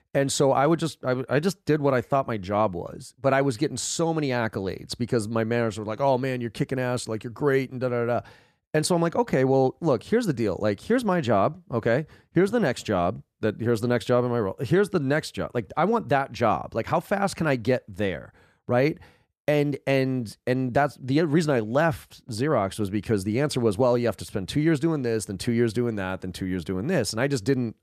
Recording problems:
none

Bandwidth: 14.5 kHz